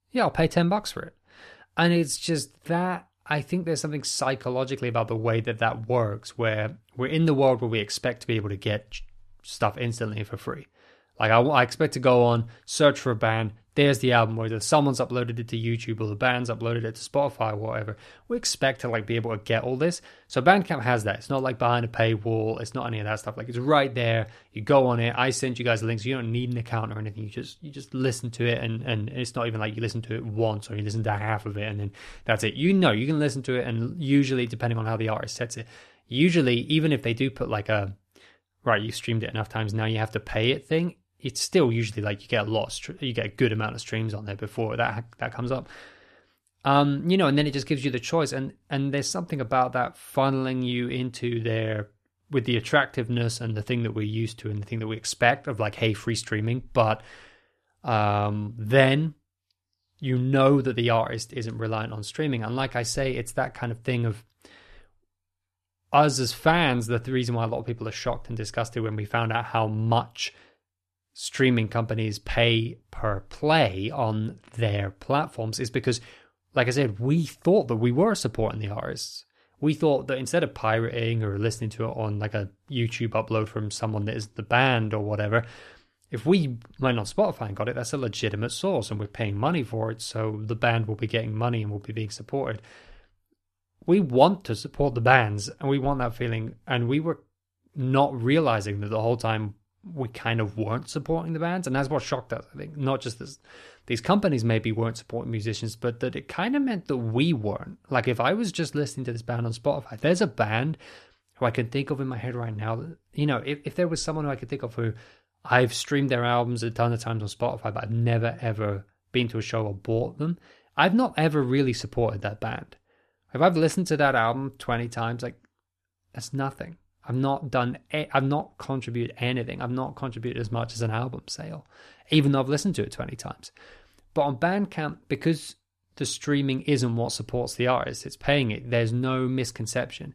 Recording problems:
none

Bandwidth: 13.5 kHz